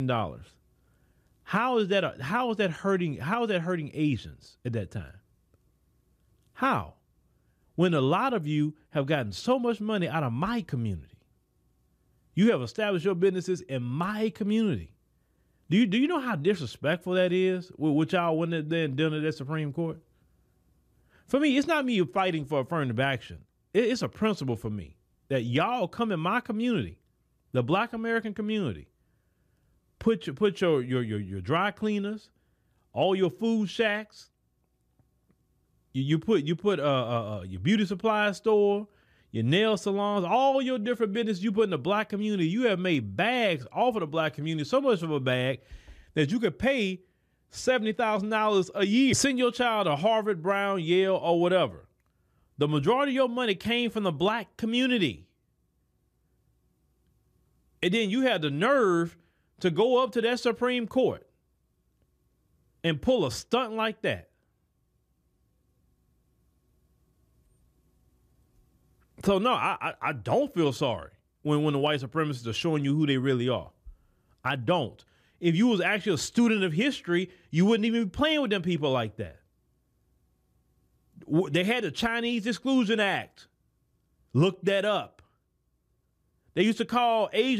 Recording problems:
abrupt cut into speech; at the start and the end

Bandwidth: 14.5 kHz